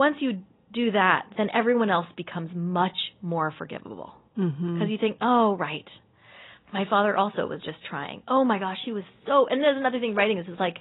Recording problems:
high frequencies cut off; severe; nothing above 4 kHz
garbled, watery; slightly
abrupt cut into speech; at the start

